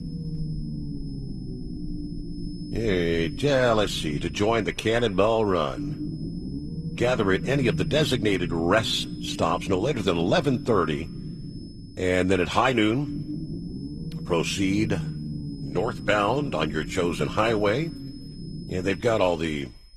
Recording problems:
garbled, watery; slightly; nothing above 15.5 kHz
low rumble; noticeable; throughout; 15 dB below the speech
high-pitched whine; faint; throughout; 5 kHz, 25 dB below the speech

